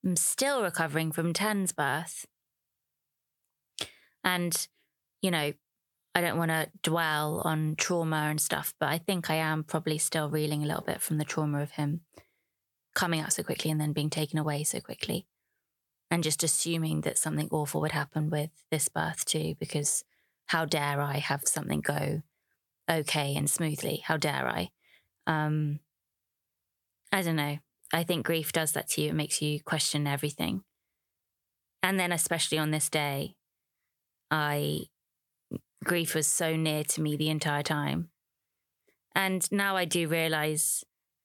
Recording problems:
squashed, flat; somewhat

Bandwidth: 18 kHz